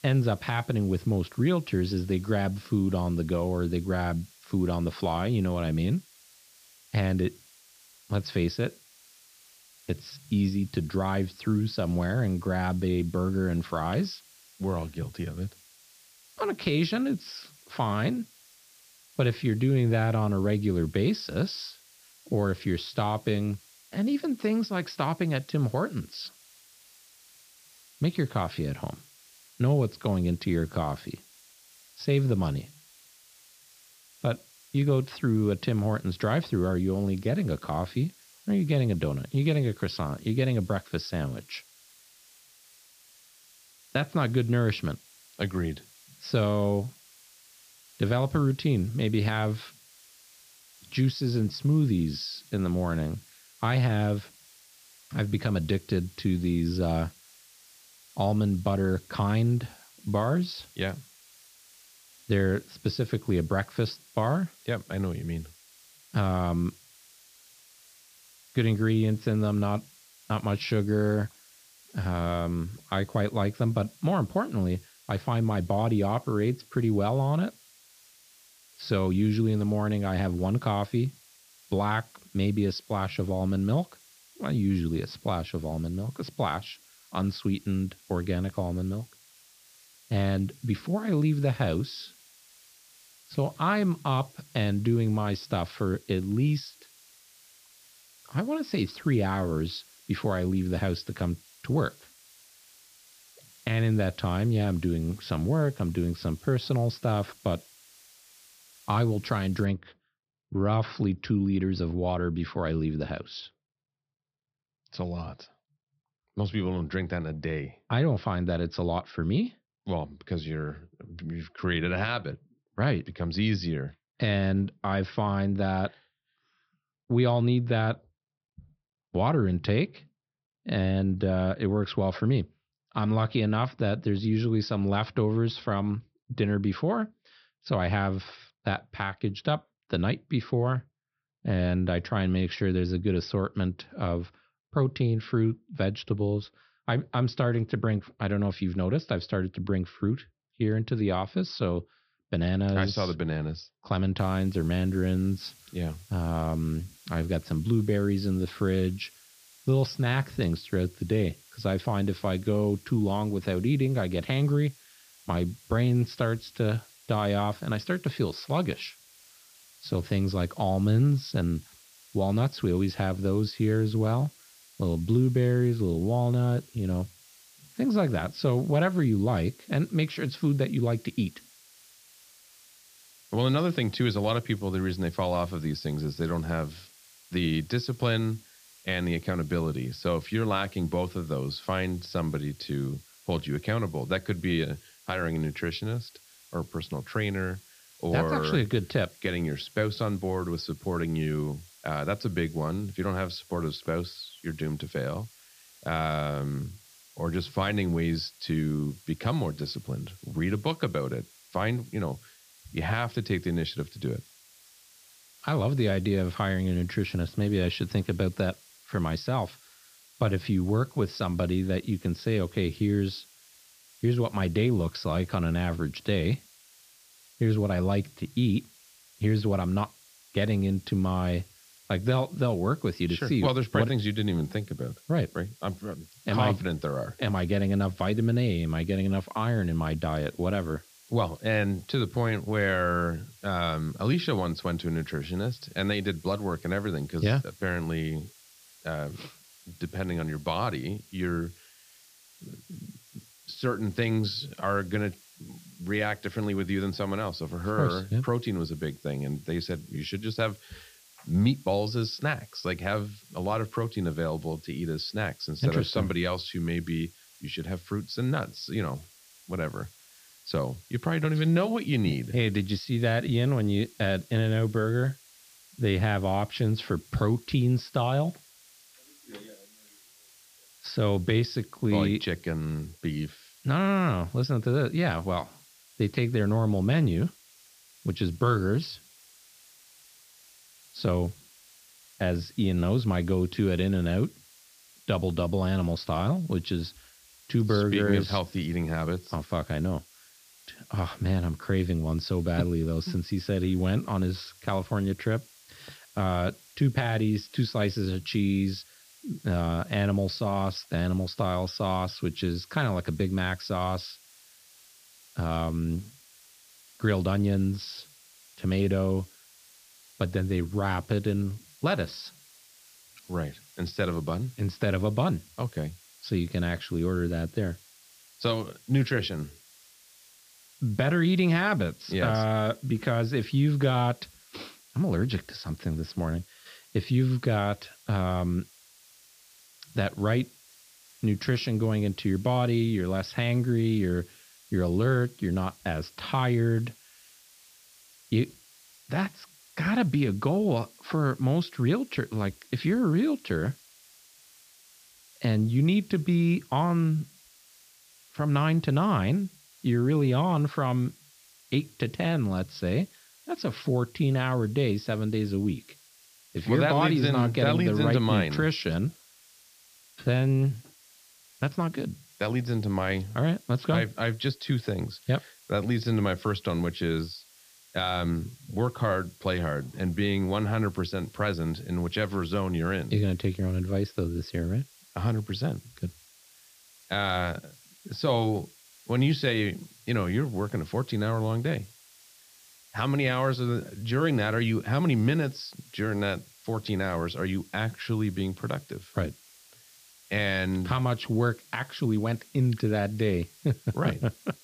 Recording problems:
high frequencies cut off; noticeable; nothing above 5.5 kHz
hiss; faint; until 1:50 and from 2:34 on; 25 dB below the speech

